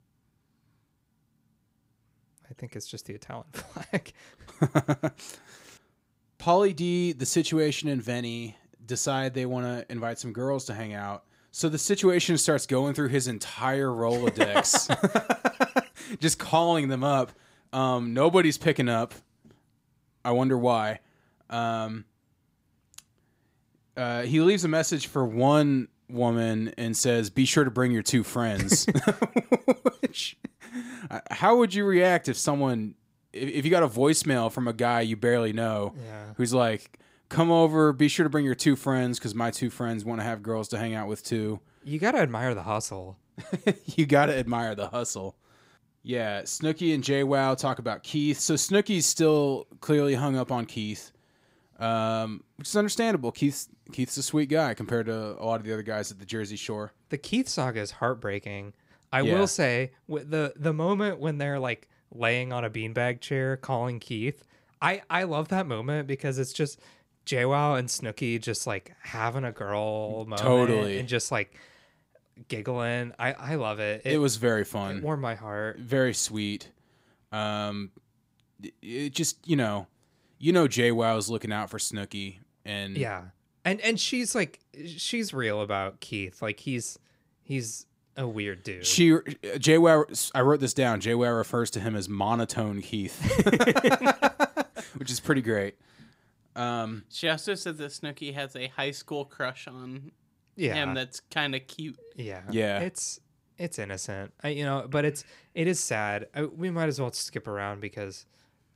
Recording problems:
none

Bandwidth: 15.5 kHz